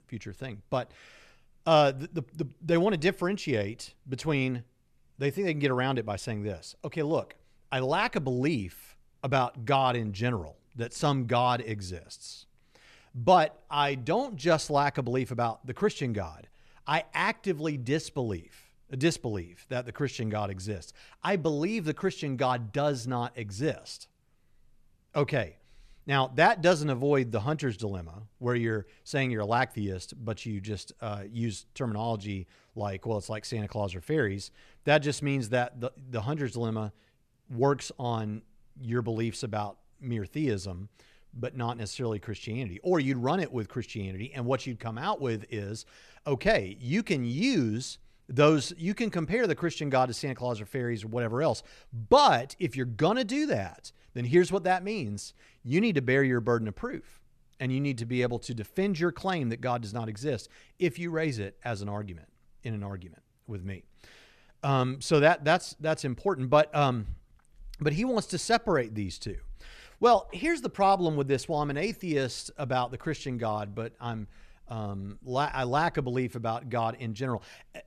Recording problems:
none

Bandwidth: 13.5 kHz